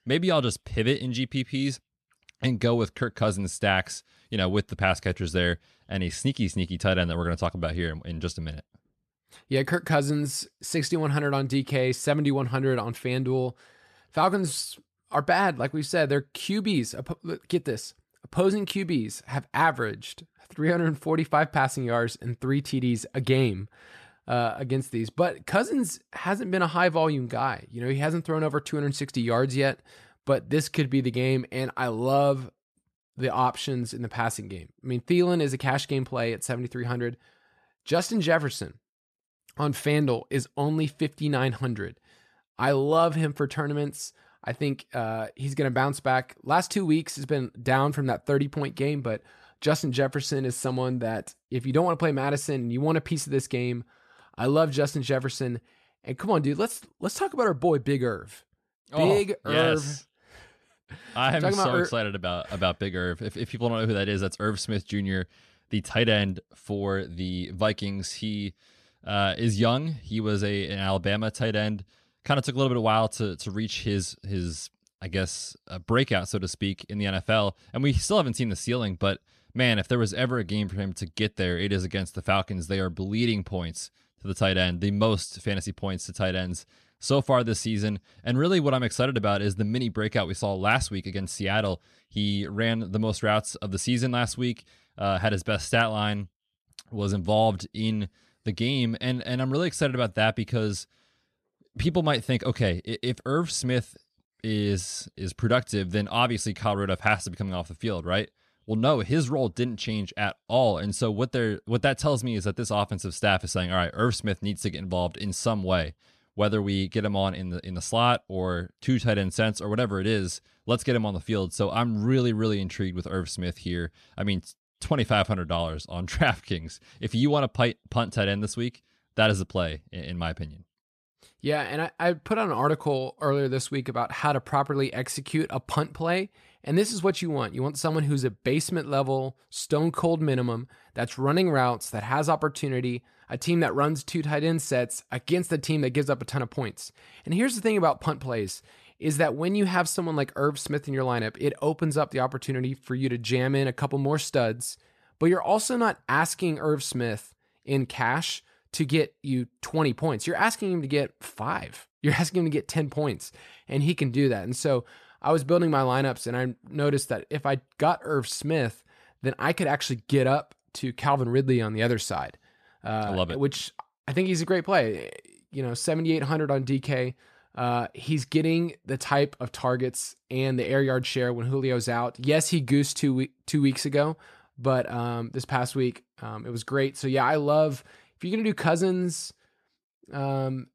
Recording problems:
none

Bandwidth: 13.5 kHz